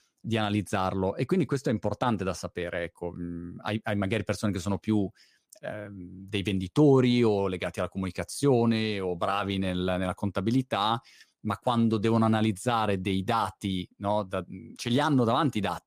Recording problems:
none

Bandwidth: 15 kHz